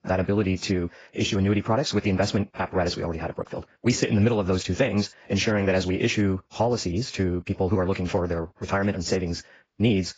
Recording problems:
garbled, watery; badly; nothing above 7.5 kHz
wrong speed, natural pitch; too fast; 1.5 times normal speed

